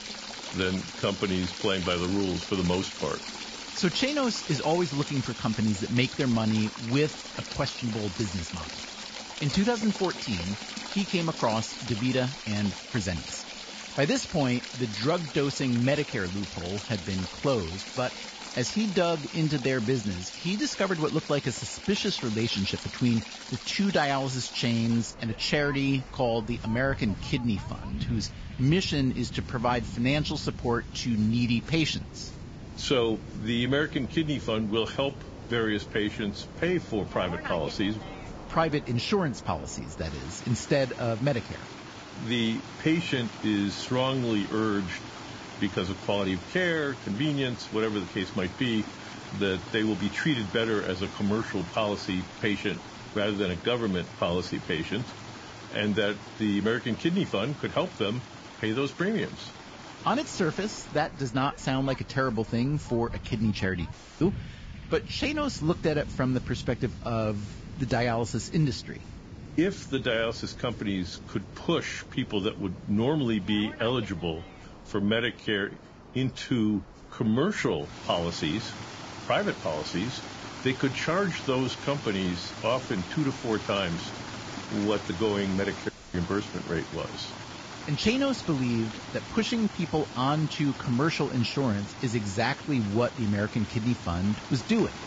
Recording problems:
garbled, watery; badly; nothing above 7.5 kHz
rain or running water; noticeable; throughout; 10 dB below the speech
audio cutting out; at 1:04 and at 1:26

